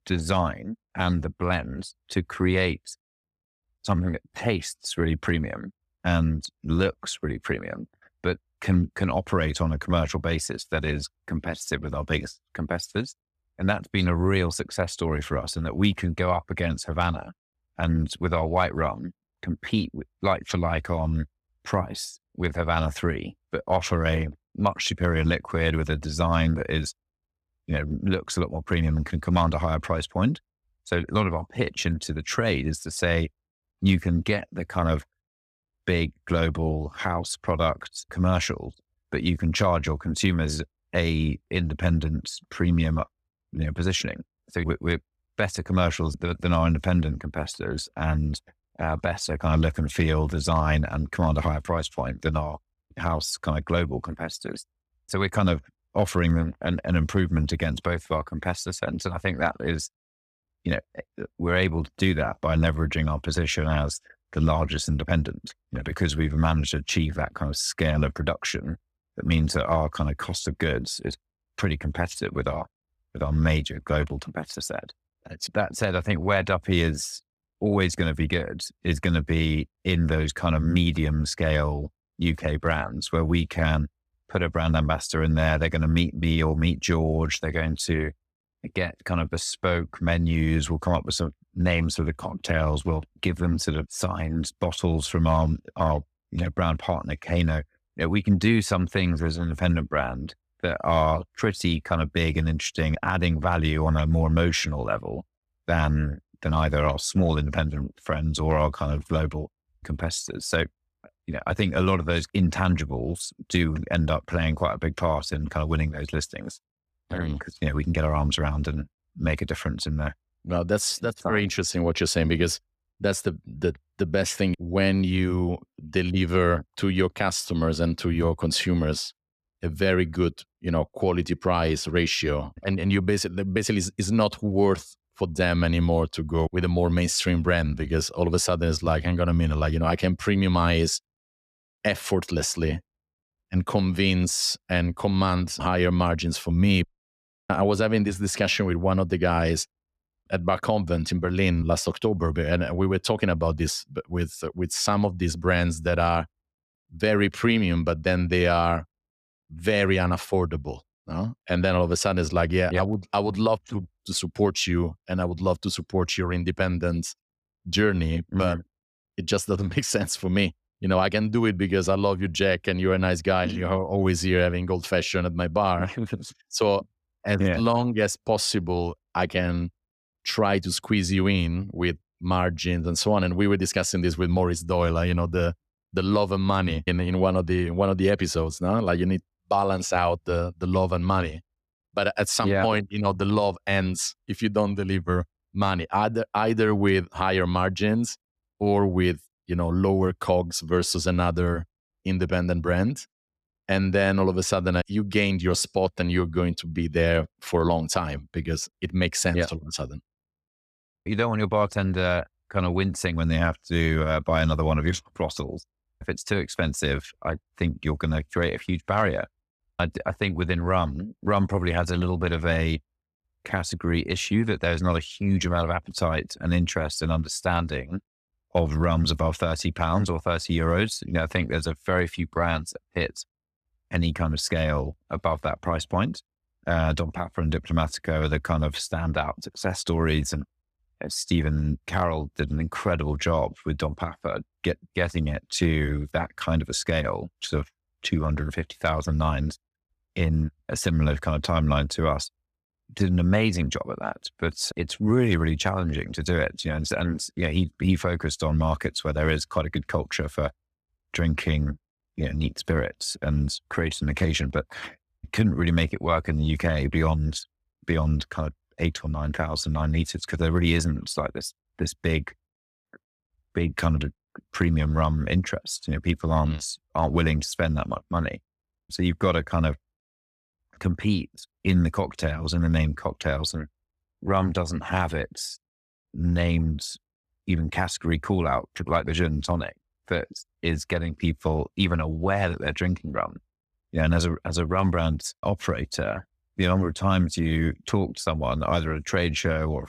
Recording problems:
none

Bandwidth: 14.5 kHz